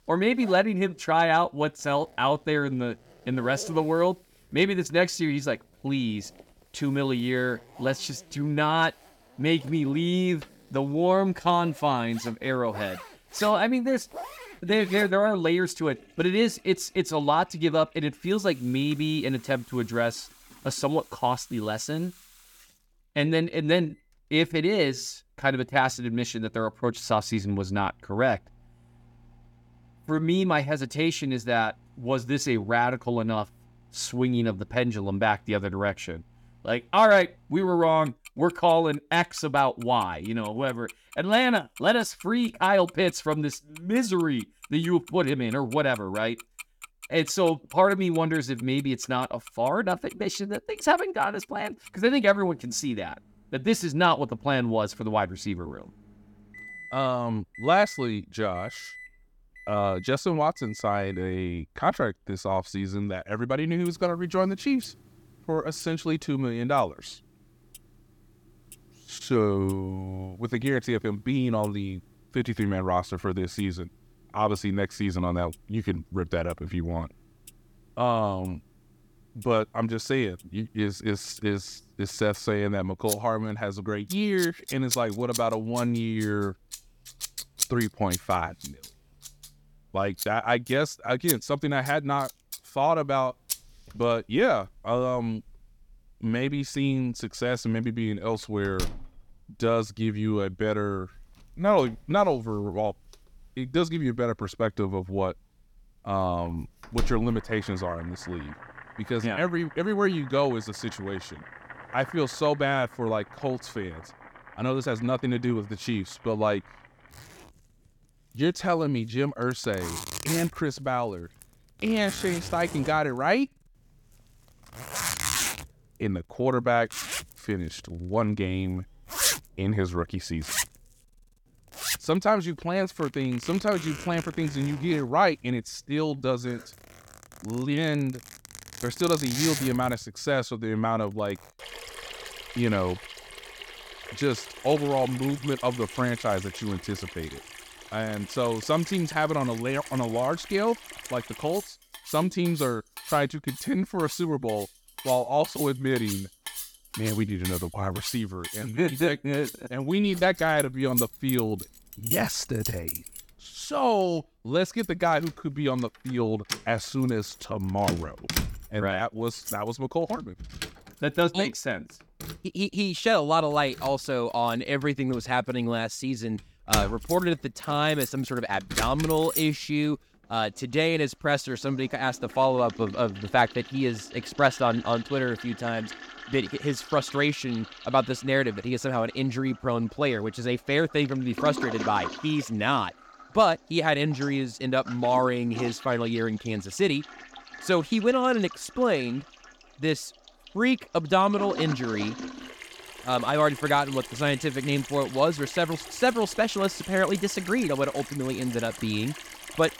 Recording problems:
household noises; noticeable; throughout; 10 dB below the speech

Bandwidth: 17.5 kHz